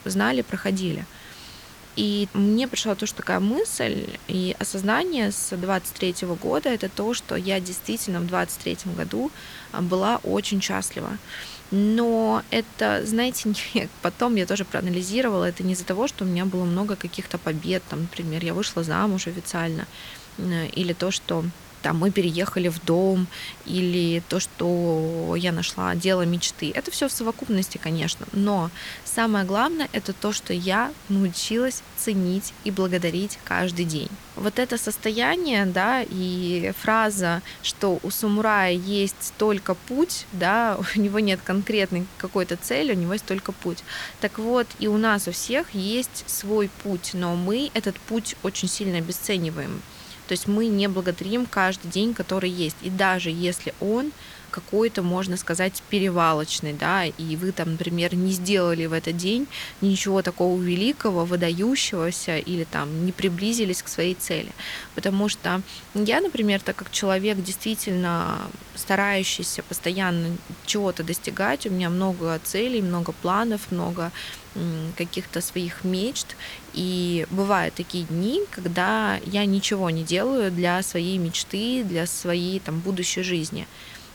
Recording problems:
hiss; noticeable; throughout; 20 dB below the speech

